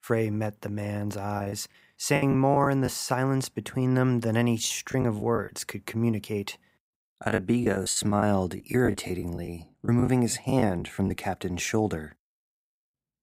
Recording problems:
choppy; very; from 1.5 to 3 s, at 4.5 s and from 7 to 11 s; 12% of the speech affected

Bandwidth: 15.5 kHz